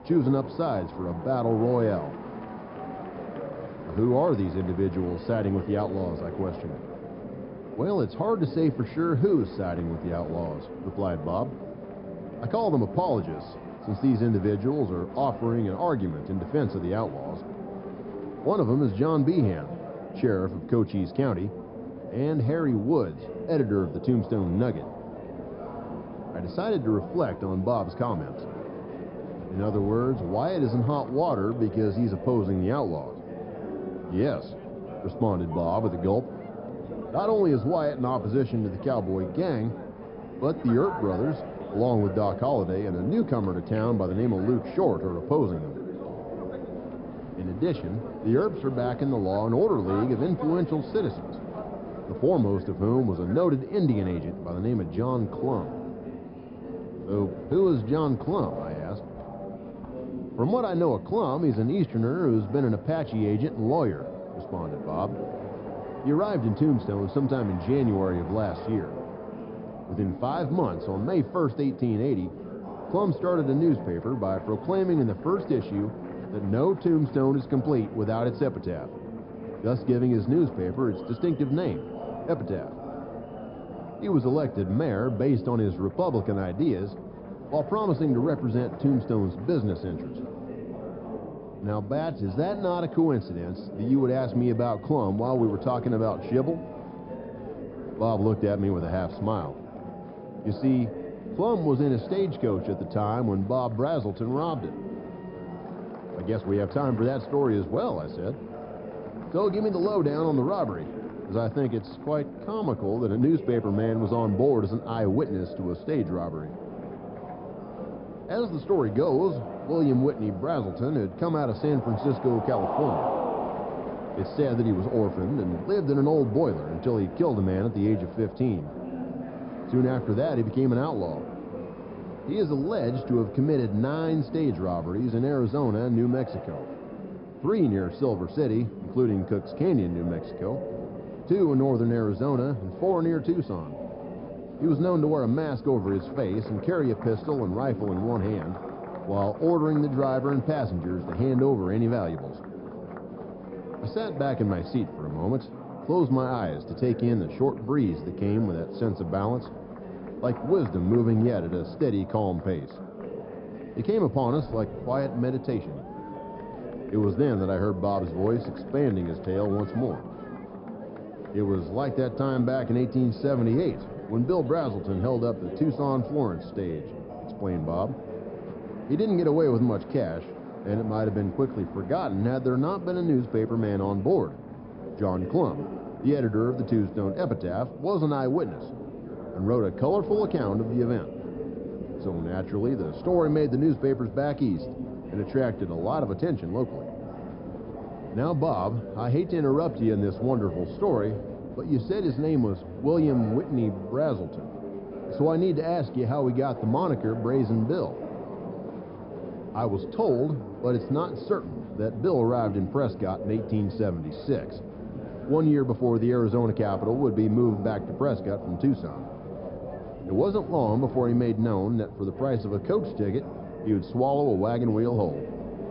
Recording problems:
high frequencies cut off; noticeable; nothing above 5.5 kHz
muffled; very slightly; fading above 1.5 kHz
murmuring crowd; noticeable; throughout; 10 dB below the speech

